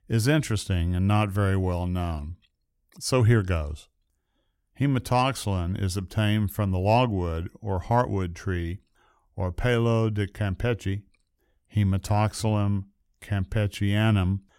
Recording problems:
none

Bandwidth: 16 kHz